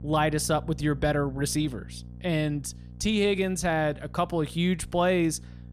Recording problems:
electrical hum; faint; throughout; 60 Hz, 25 dB below the speech

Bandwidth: 14.5 kHz